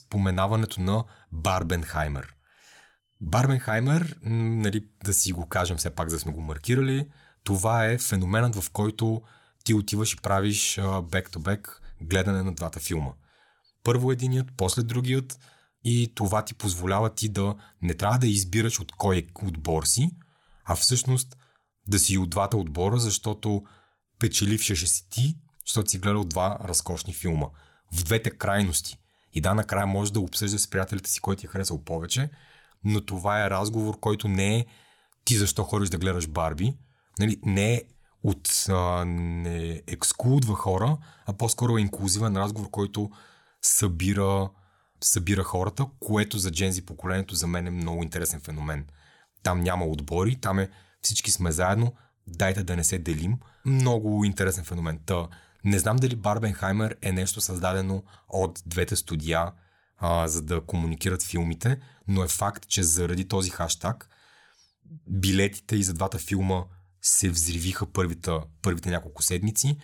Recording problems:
none

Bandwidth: 17.5 kHz